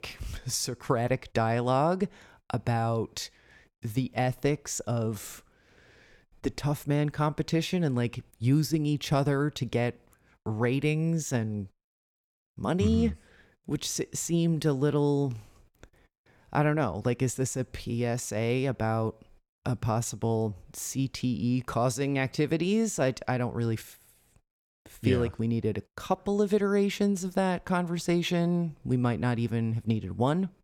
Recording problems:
none

